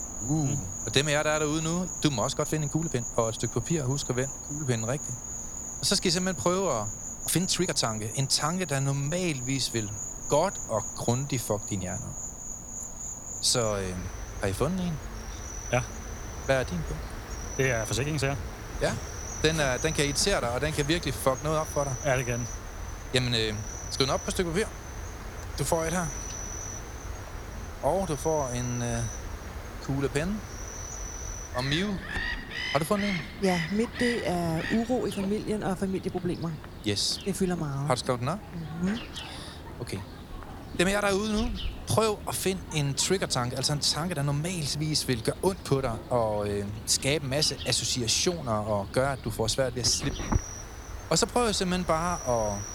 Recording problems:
animal sounds; loud; throughout; 9 dB below the speech
uneven, jittery; strongly; from 2.5 to 24 s

